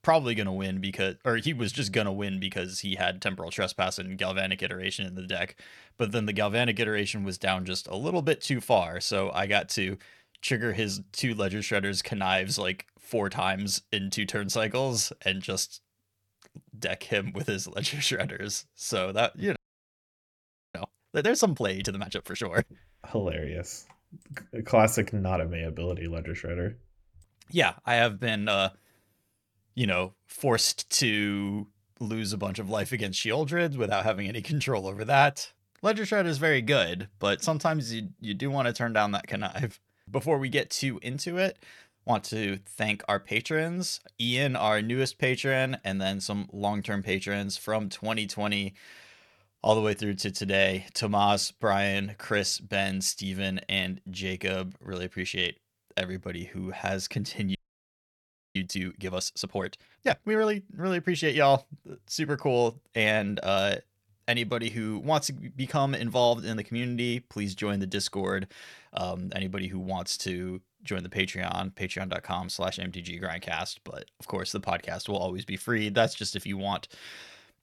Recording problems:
audio freezing; at 20 s for 1 s and at 58 s for 1 s

